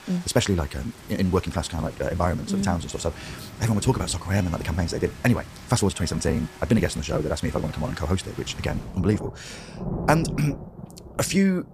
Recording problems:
wrong speed, natural pitch; too fast; 1.6 times normal speed
rain or running water; noticeable; throughout; 15 dB below the speech

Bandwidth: 15 kHz